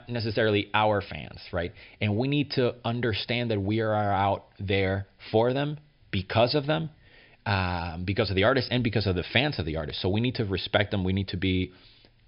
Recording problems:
high frequencies cut off; noticeable; nothing above 5.5 kHz

